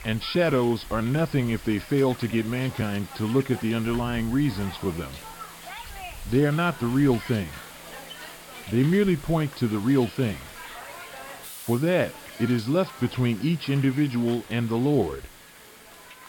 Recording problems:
high frequencies cut off; noticeable; nothing above 5.5 kHz
hiss; noticeable; throughout; 15 dB below the speech

